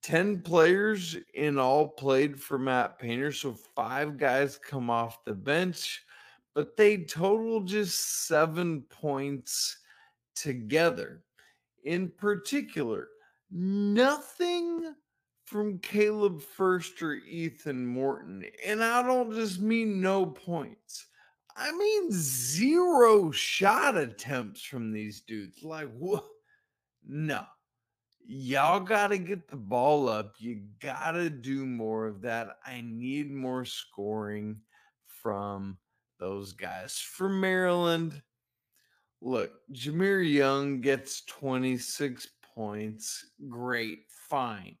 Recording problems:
wrong speed, natural pitch; too slow; 0.6 times normal speed

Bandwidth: 15 kHz